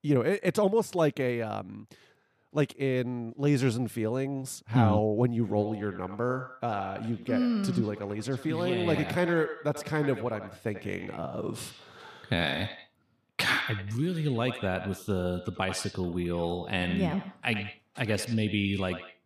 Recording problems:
echo of what is said; strong; from 5.5 s on; 90 ms later, 10 dB below the speech

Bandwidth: 14.5 kHz